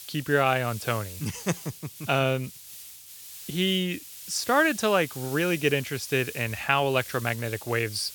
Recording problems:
hiss; noticeable; throughout; 15 dB below the speech

